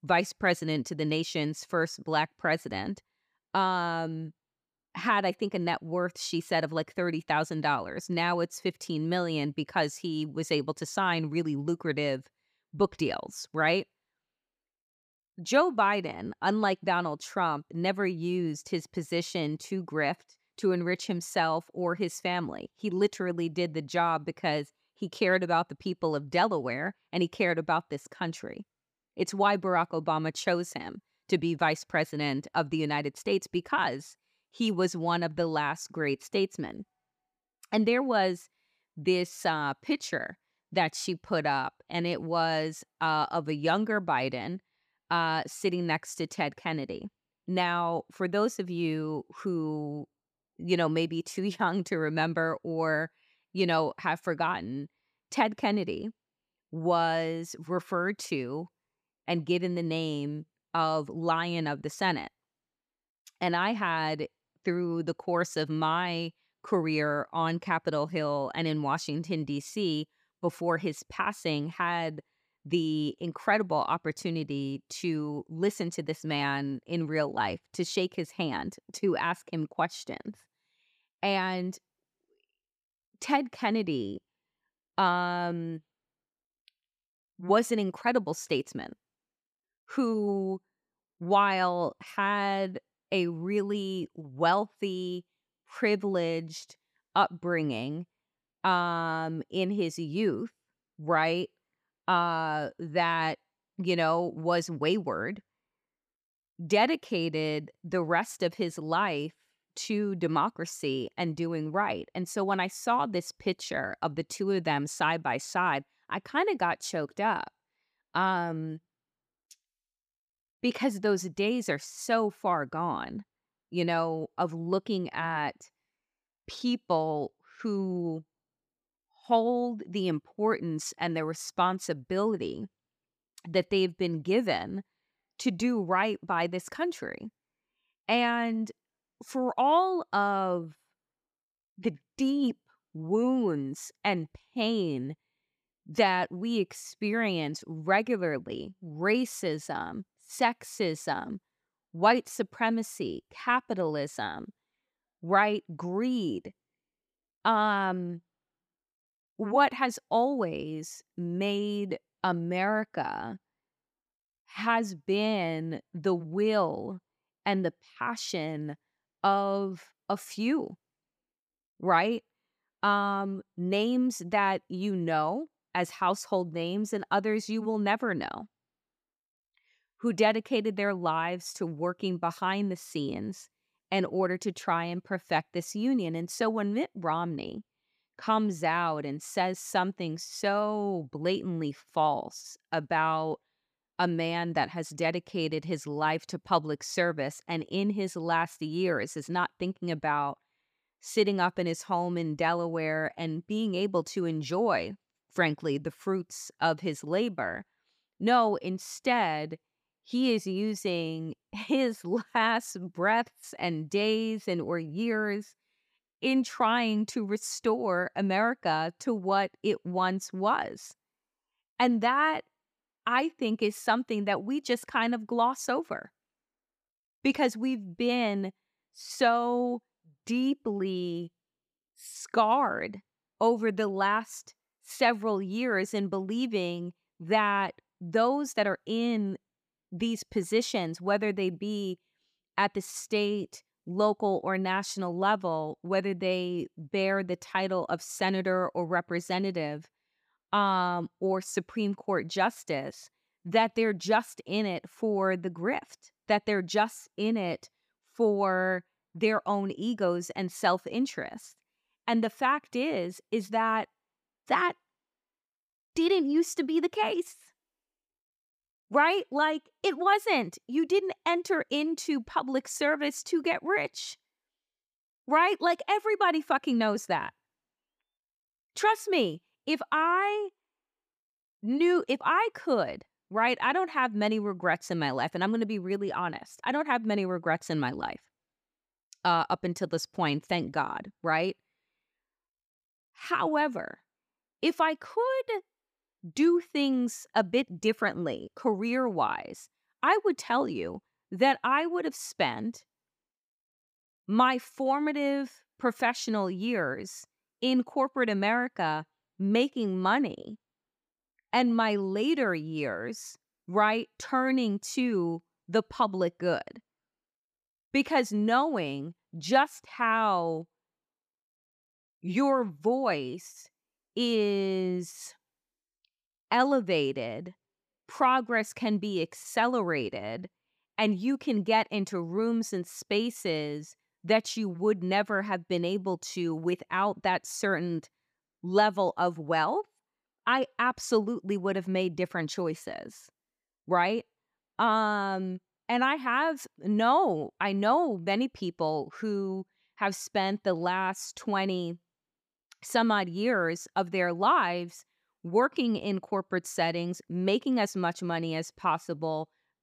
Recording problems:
none

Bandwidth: 15 kHz